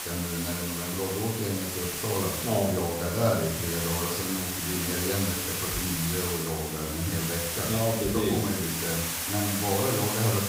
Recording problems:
off-mic speech; far
room echo; noticeable; dies away in 0.6 s
hiss; loud; throughout; as loud as the speech

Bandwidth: 15.5 kHz